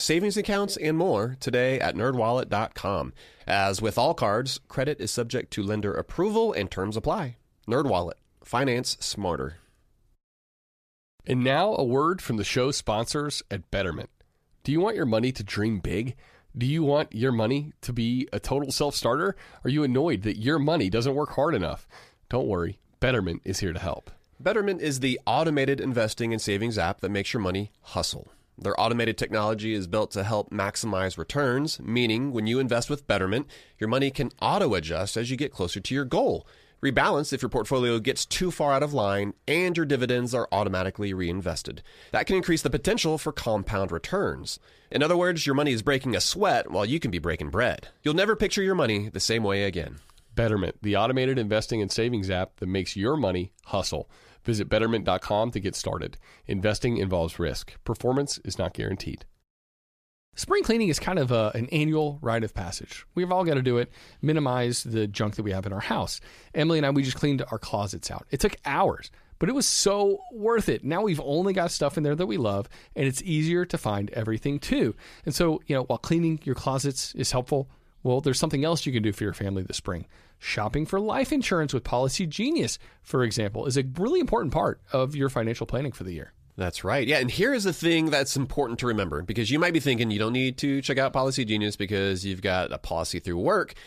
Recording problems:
abrupt cut into speech; at the start

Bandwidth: 14.5 kHz